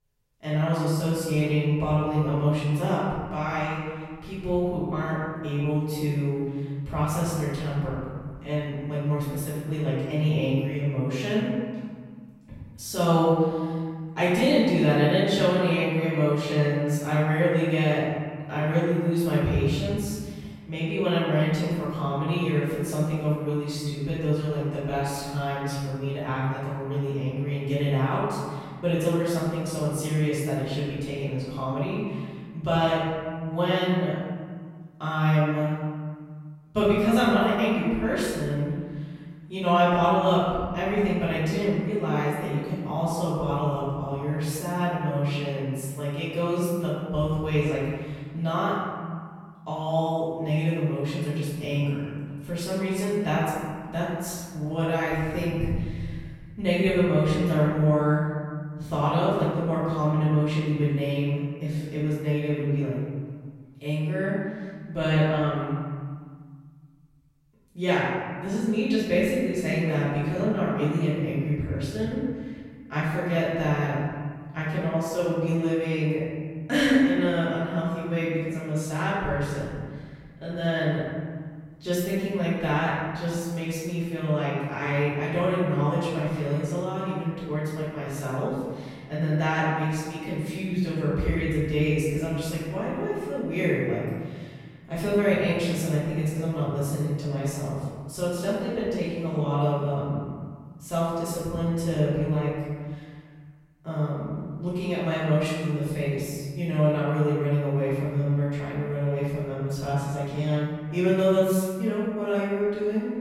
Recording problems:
room echo; strong; dies away in 1.7 s
off-mic speech; far

